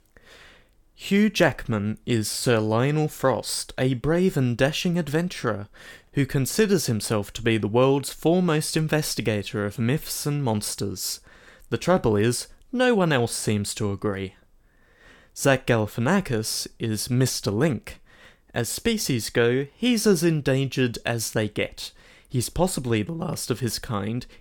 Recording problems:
none

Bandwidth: 18 kHz